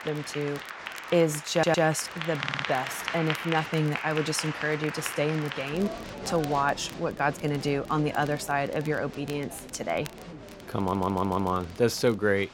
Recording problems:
crowd noise; loud; throughout; 9 dB below the speech
crackle, like an old record; faint; 20 dB below the speech
audio stuttering; at 1.5 s, at 2.5 s and at 11 s

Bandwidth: 16 kHz